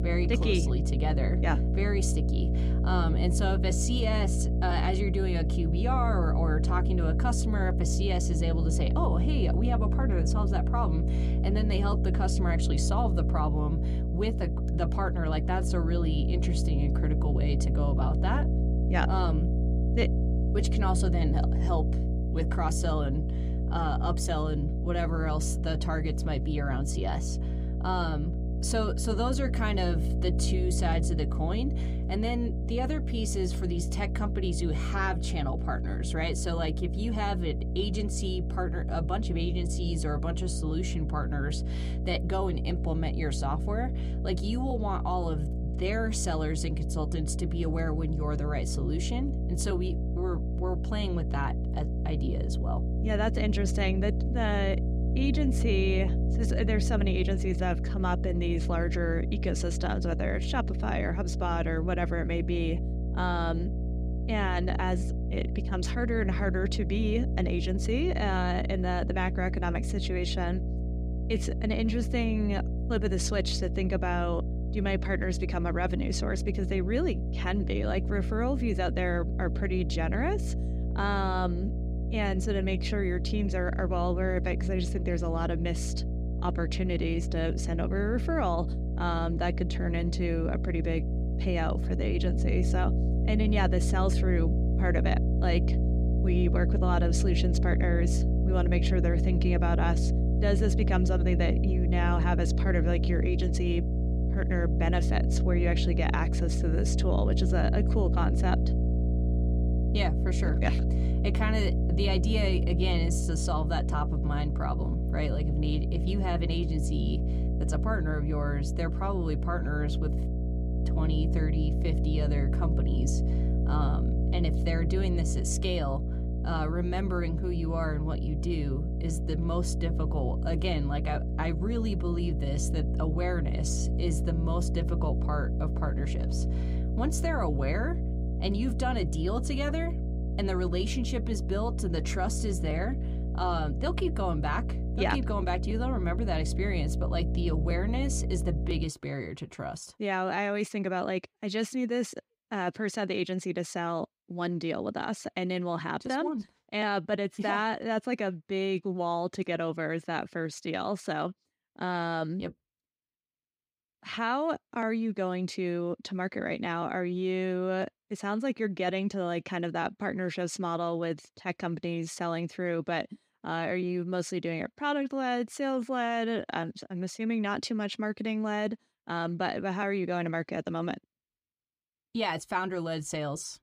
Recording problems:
electrical hum; loud; until 2:29; 60 Hz, 8 dB below the speech

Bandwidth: 15.5 kHz